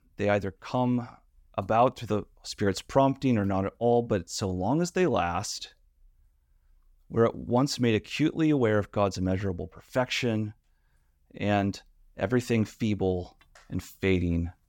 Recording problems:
none

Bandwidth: 17 kHz